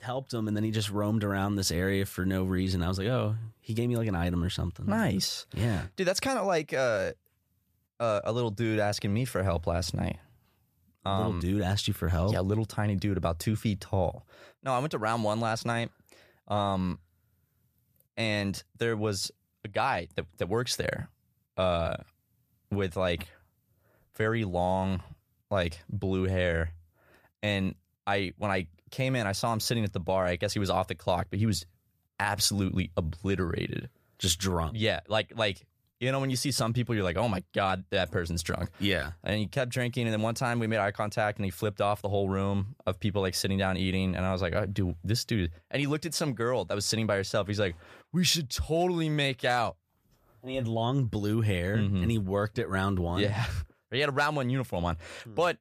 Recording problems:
none

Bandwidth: 14.5 kHz